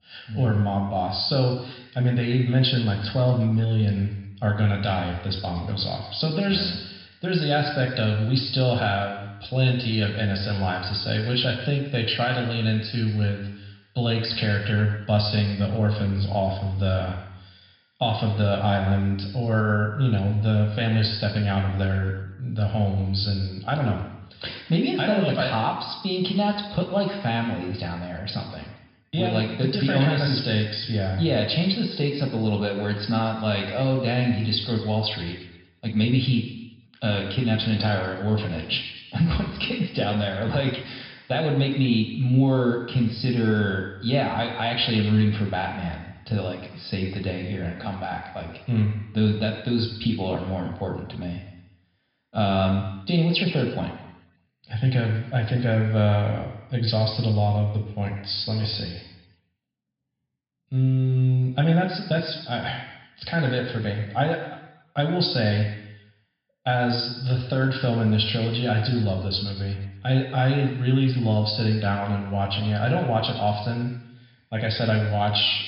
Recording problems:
room echo; noticeable; dies away in 1 s
high frequencies cut off; noticeable; nothing above 5.5 kHz
off-mic speech; somewhat distant

